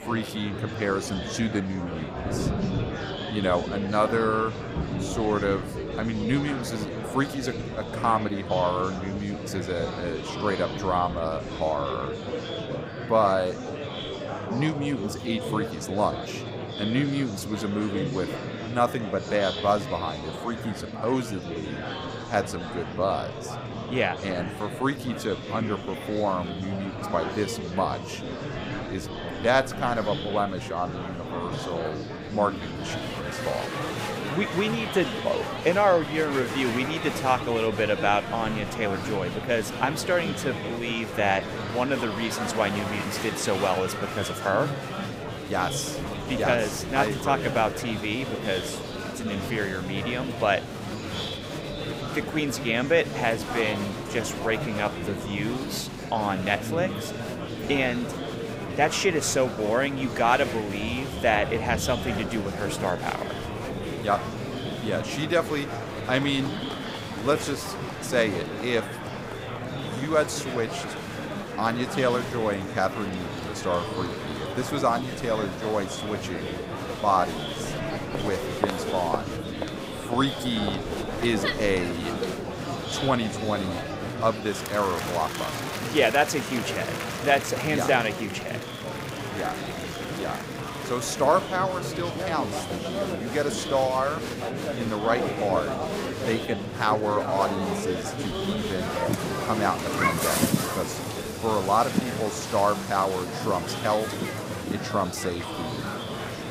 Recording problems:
murmuring crowd; loud; throughout; 4 dB below the speech
rain or running water; noticeable; throughout; 15 dB below the speech

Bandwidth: 15.5 kHz